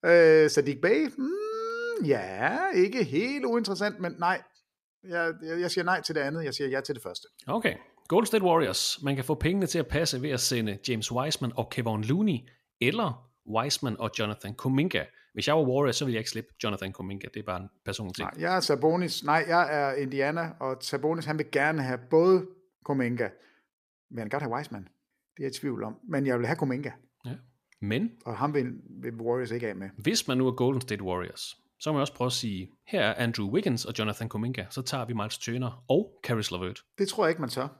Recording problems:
uneven, jittery; strongly; from 5 to 24 s

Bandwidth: 14.5 kHz